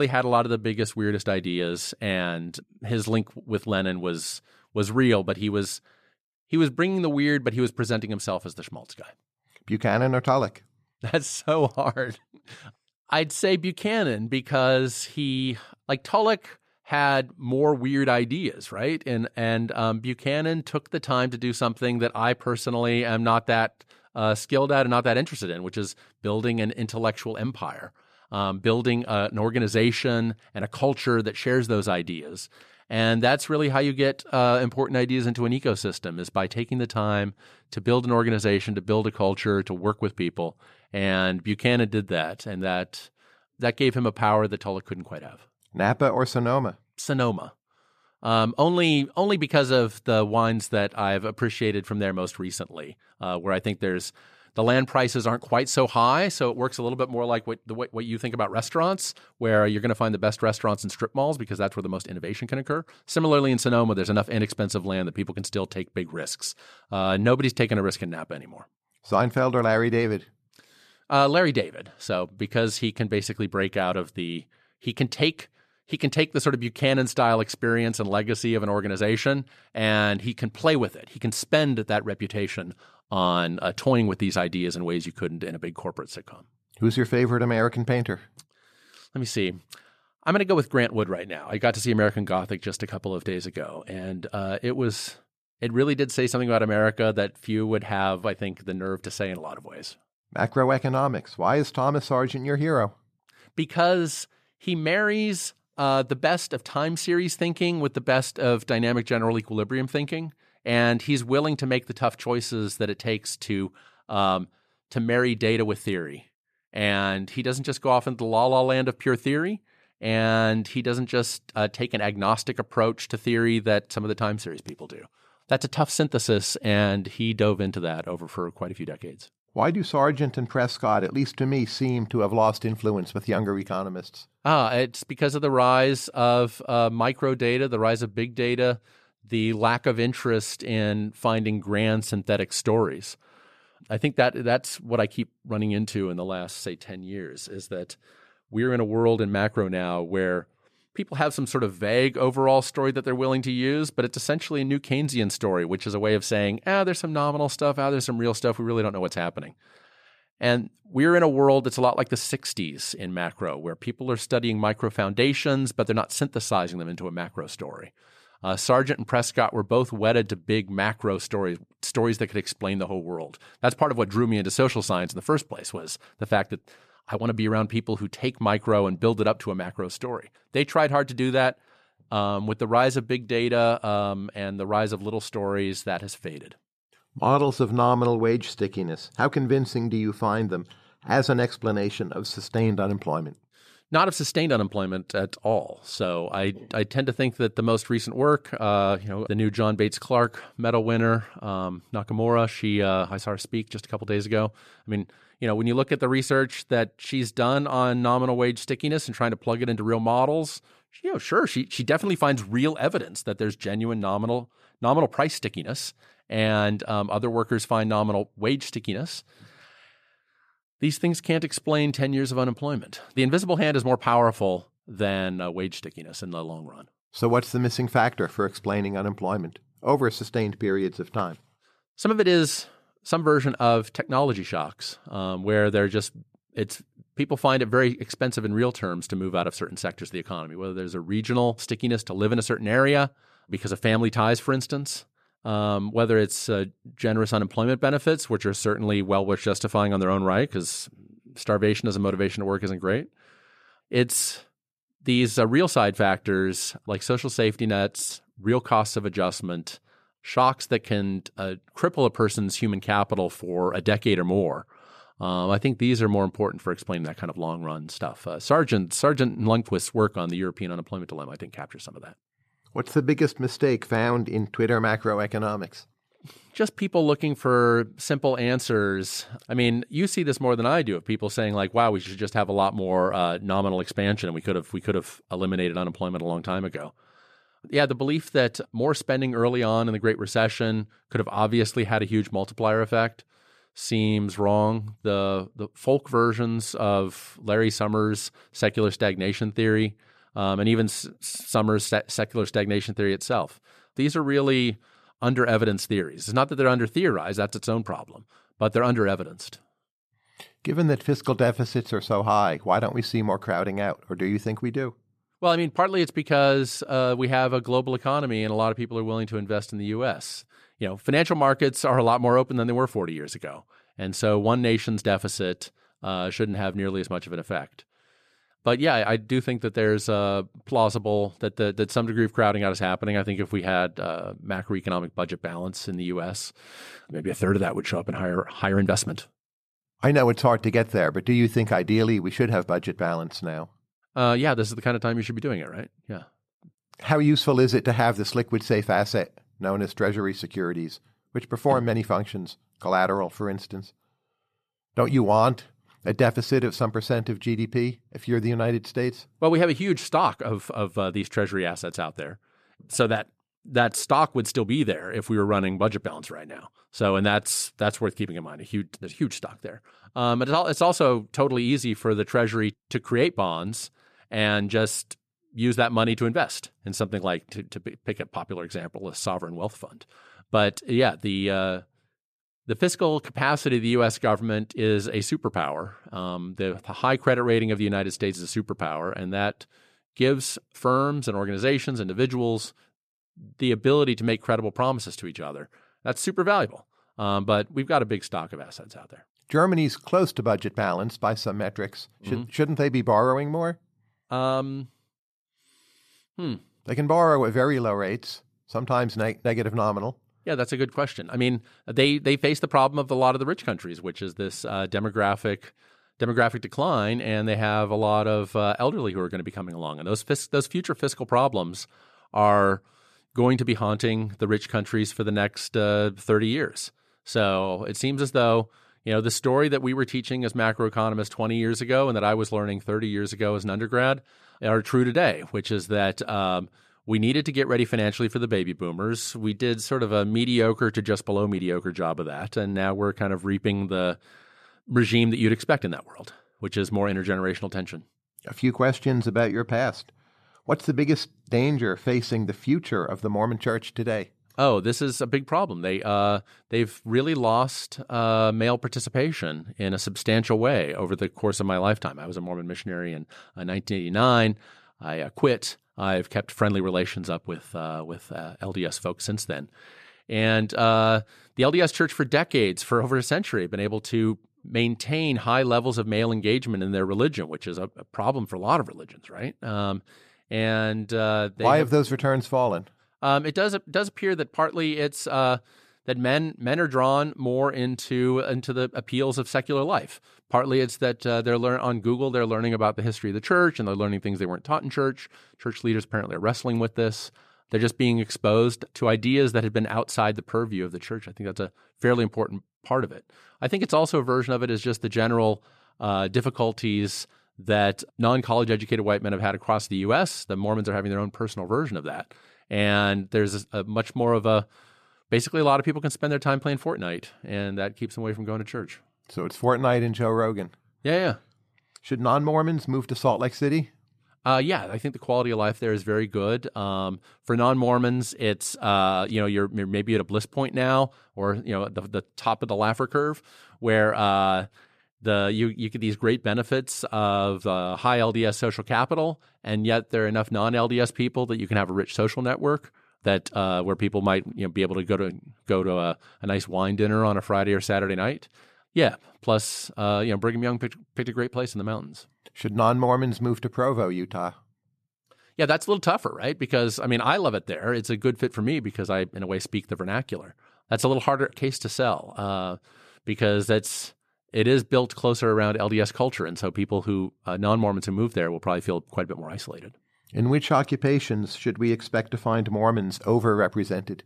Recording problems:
abrupt cut into speech; at the start

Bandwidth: 14 kHz